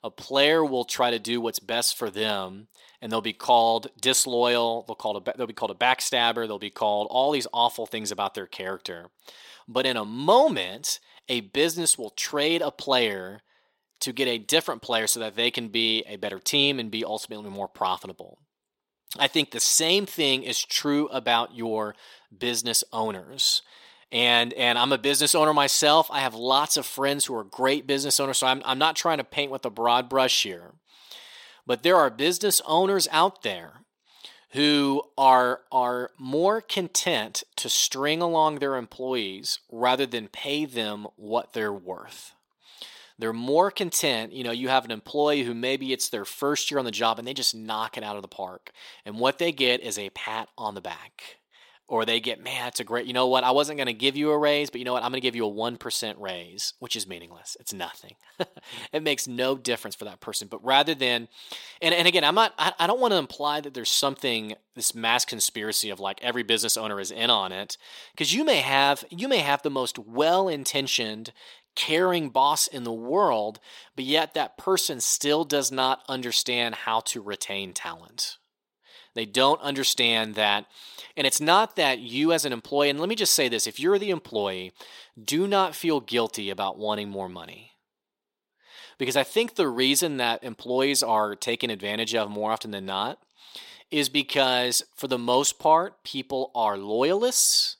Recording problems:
thin; somewhat; fading below 350 Hz

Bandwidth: 16.5 kHz